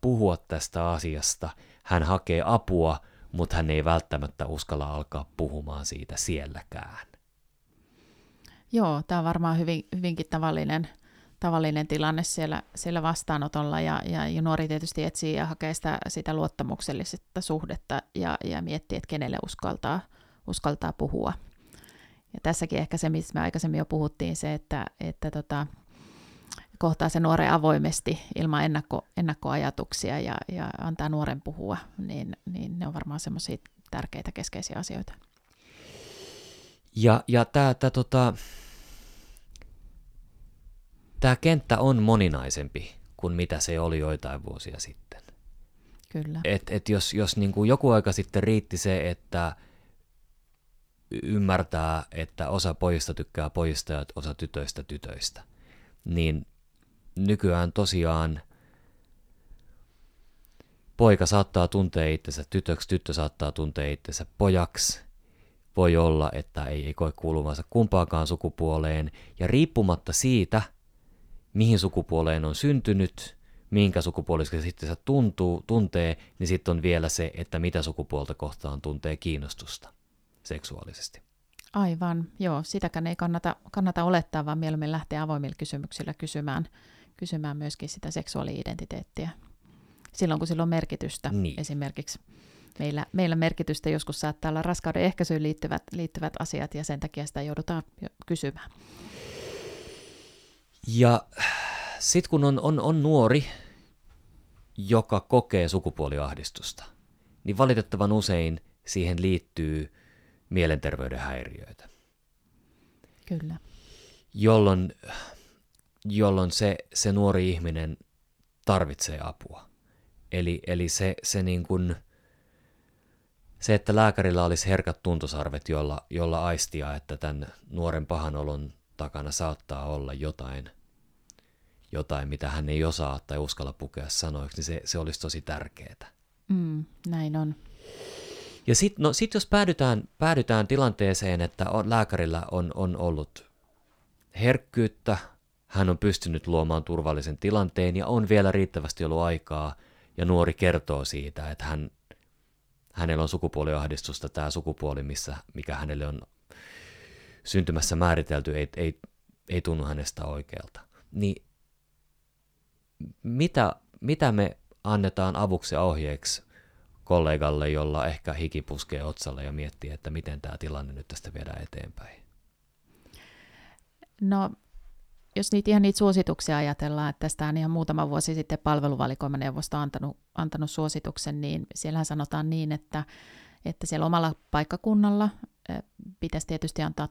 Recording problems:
none

